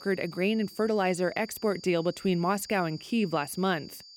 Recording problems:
high-pitched whine; noticeable; throughout; 4.5 kHz, 20 dB below the speech

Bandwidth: 17 kHz